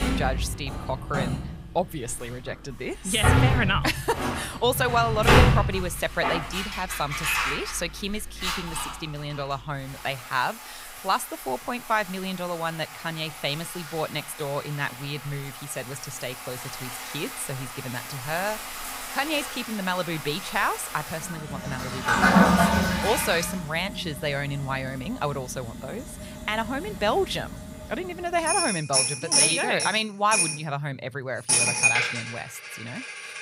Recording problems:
household noises; very loud; throughout; 3 dB above the speech

